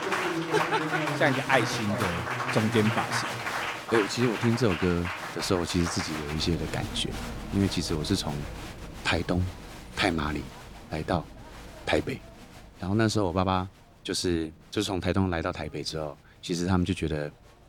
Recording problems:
crowd noise; loud; throughout; 4 dB below the speech

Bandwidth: 18 kHz